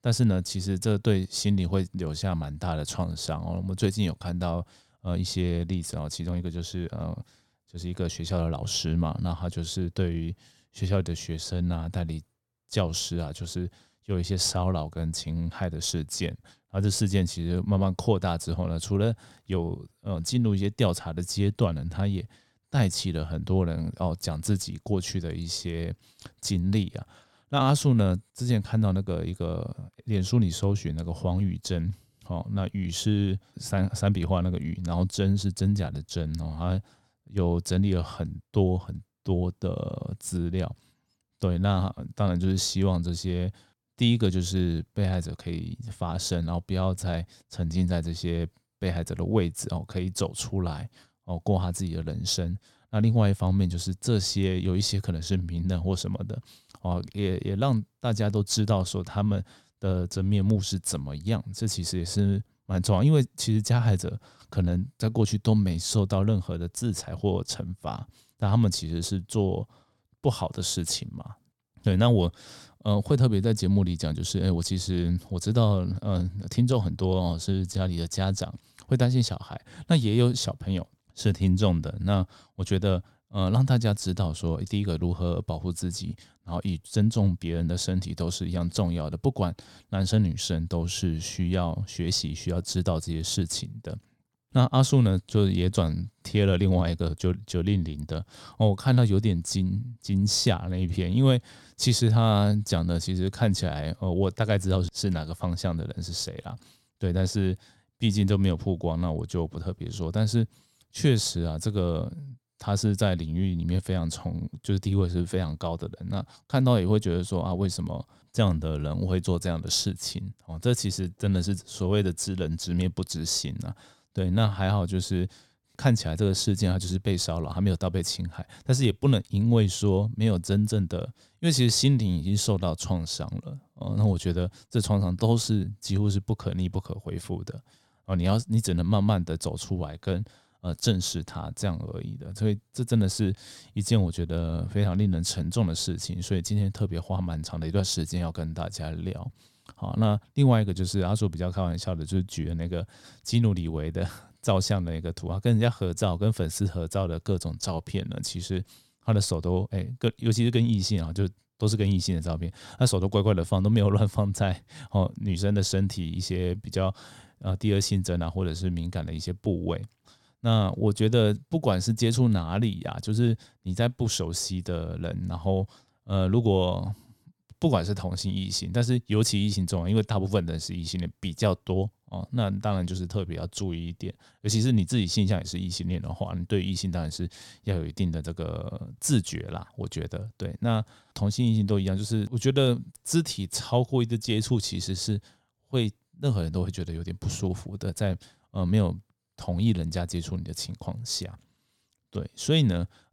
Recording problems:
none

